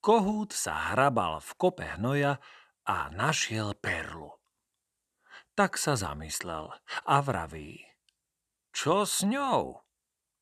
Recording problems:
none

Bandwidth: 13.5 kHz